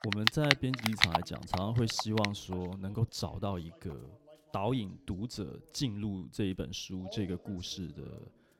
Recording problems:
household noises; very loud; throughout; 4 dB above the speech
voice in the background; faint; throughout; 20 dB below the speech

